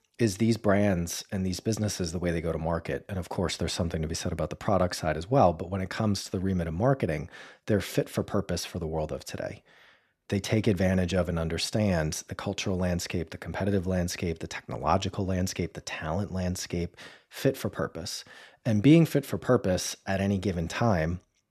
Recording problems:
none

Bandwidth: 14 kHz